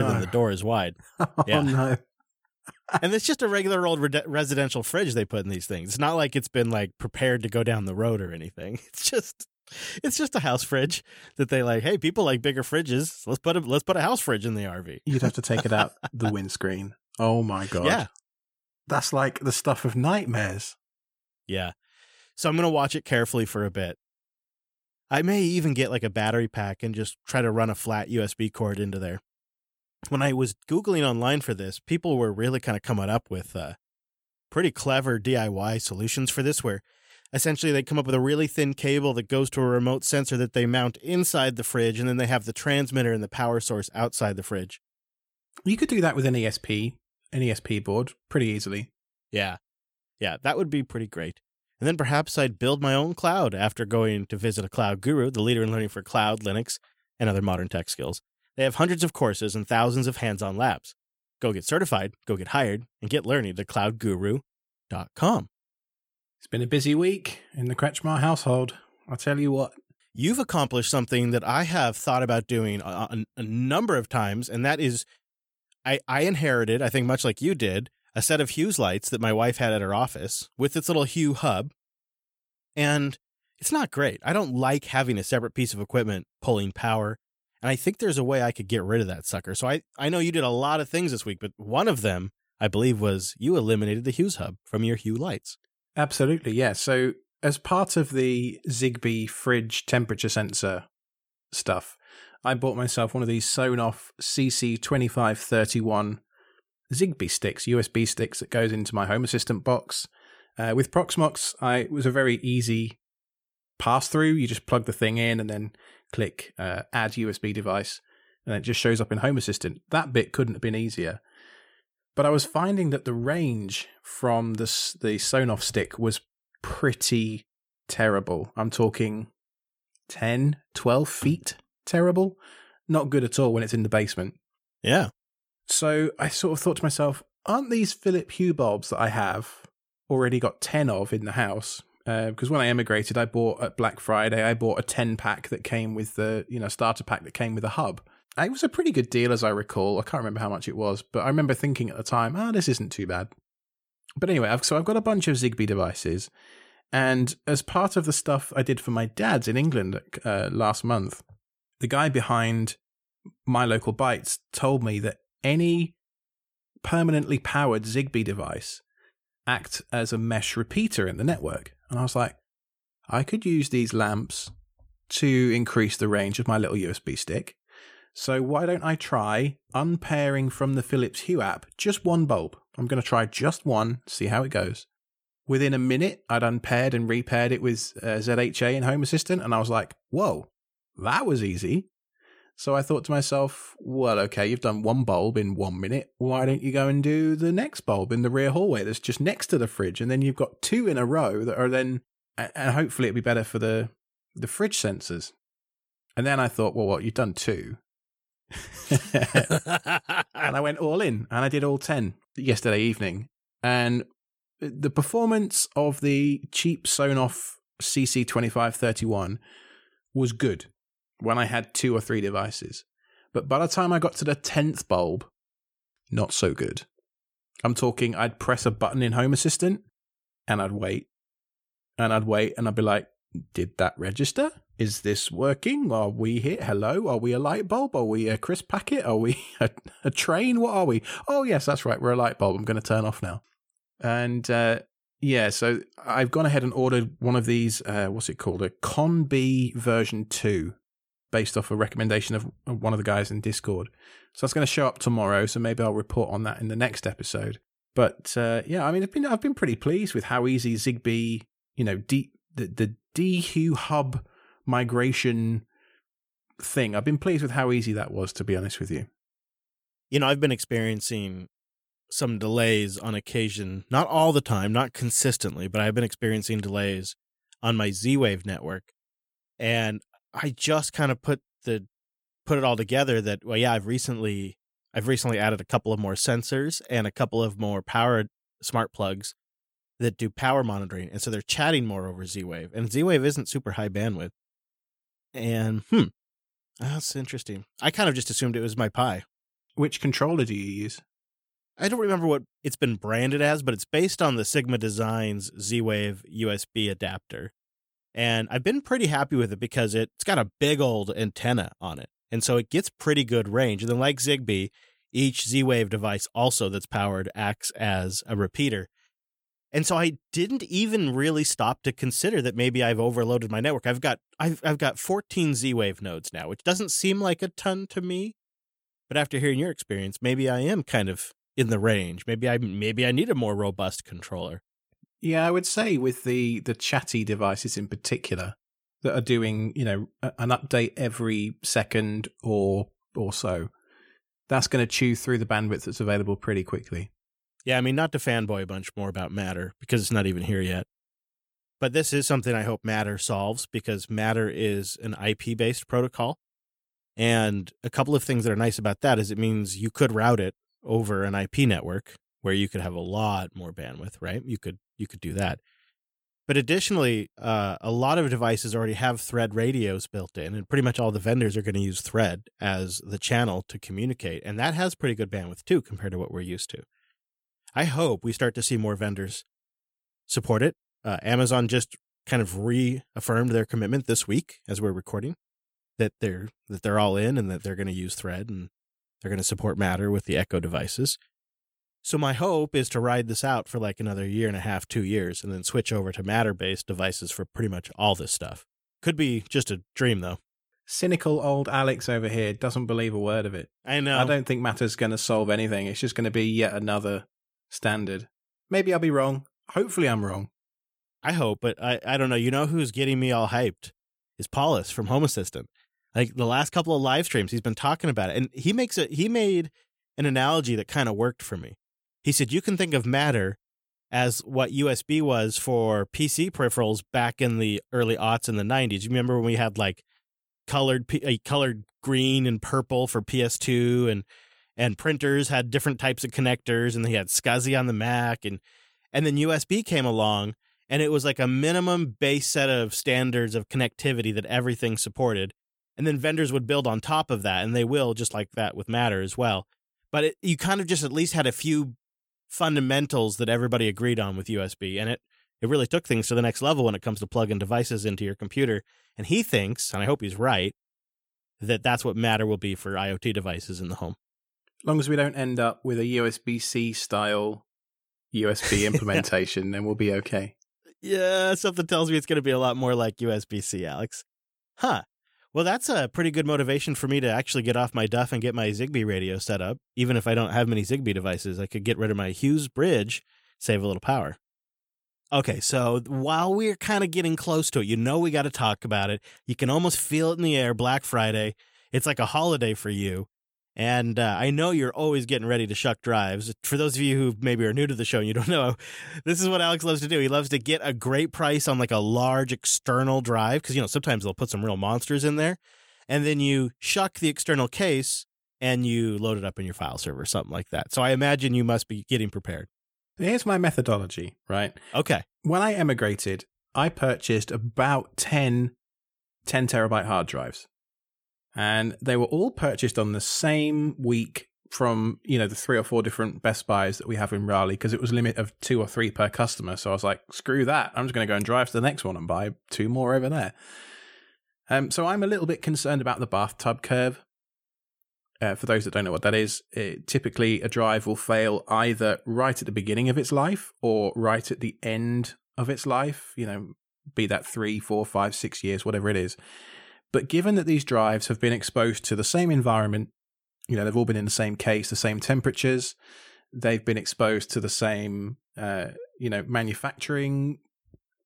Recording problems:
abrupt cut into speech; at the start

